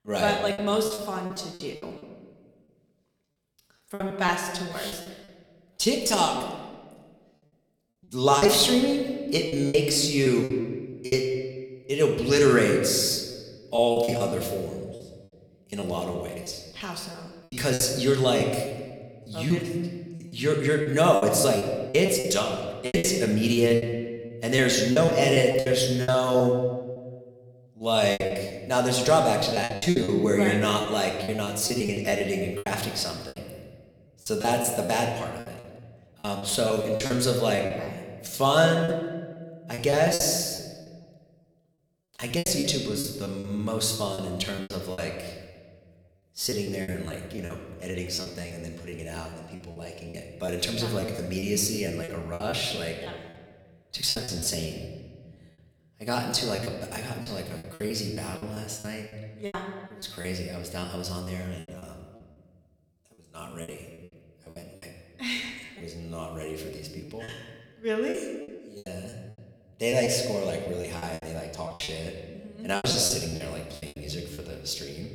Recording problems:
room echo; slight; dies away in 1.3 s
off-mic speech; somewhat distant
choppy; very; 13% of the speech affected

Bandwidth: 18.5 kHz